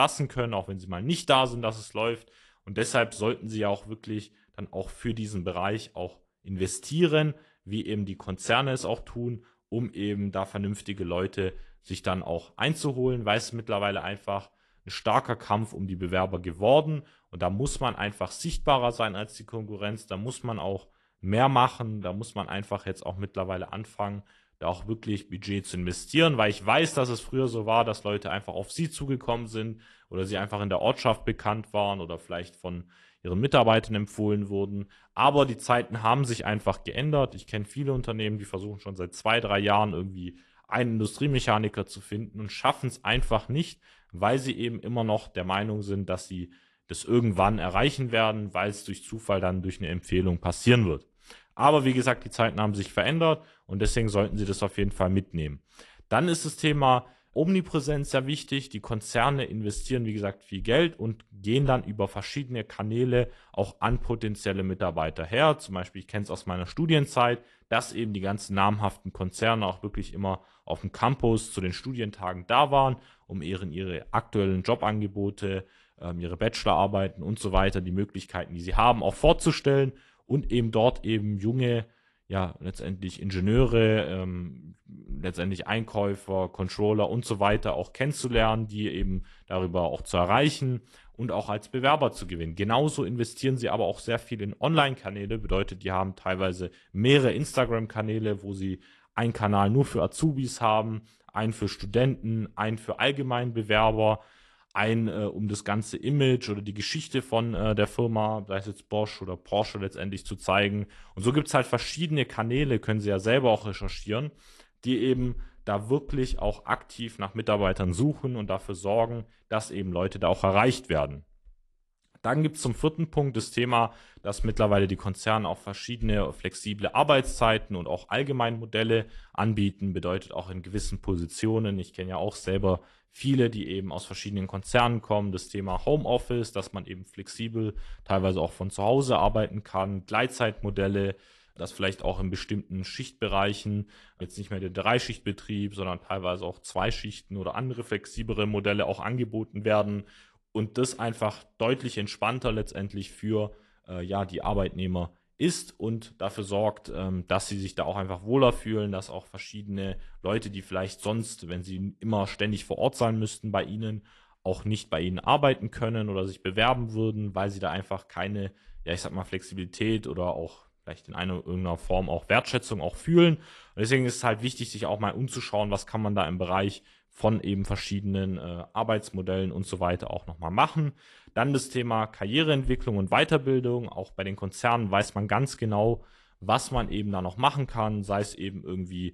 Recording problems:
garbled, watery; slightly
abrupt cut into speech; at the start

